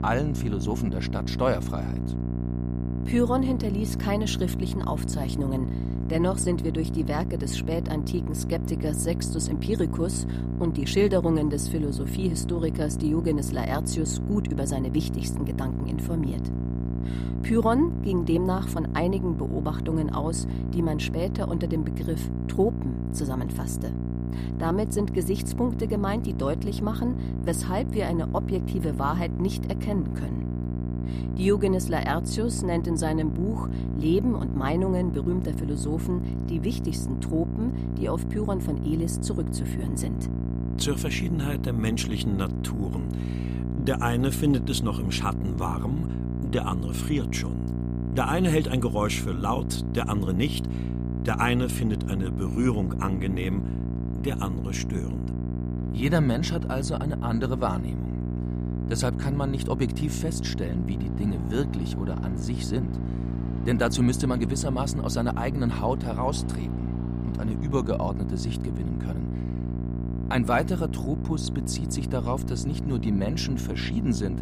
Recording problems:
electrical hum; loud; throughout; 60 Hz, 7 dB below the speech
traffic noise; faint; throughout; 25 dB below the speech

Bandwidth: 15 kHz